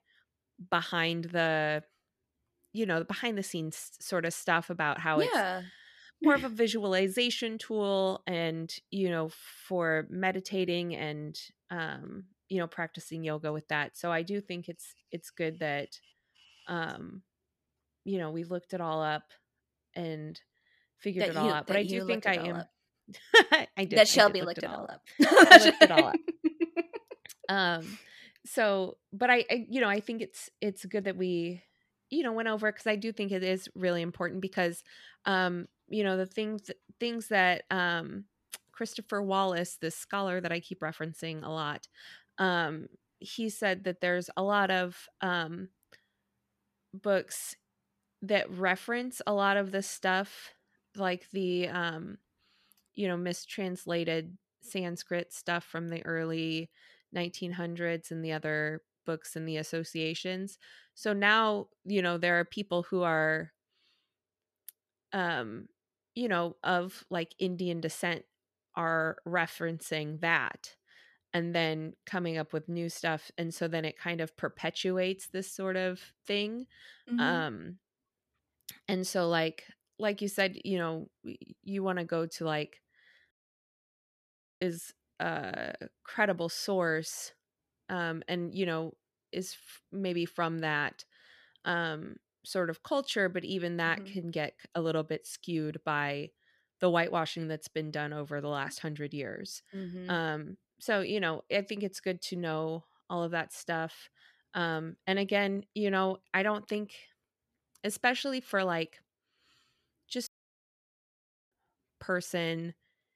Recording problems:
audio cutting out; at 1:23 for 1.5 s and at 1:50 for 1 s

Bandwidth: 14.5 kHz